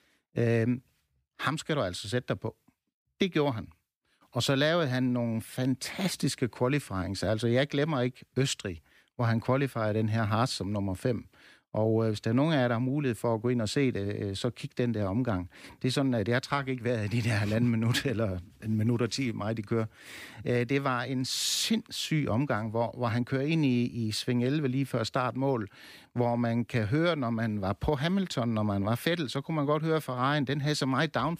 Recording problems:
none

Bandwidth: 15 kHz